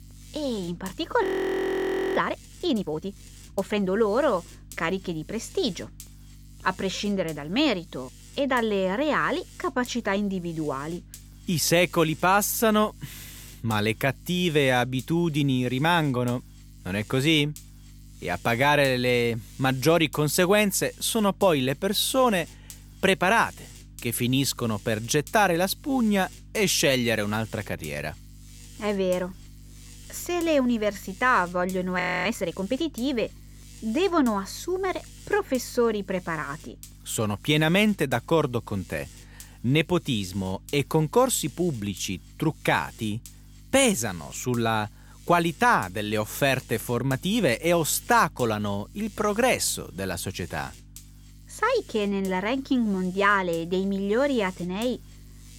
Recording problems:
electrical hum; faint; throughout; 50 Hz, 25 dB below the speech
audio freezing; at 1 s for 1 s and at 32 s

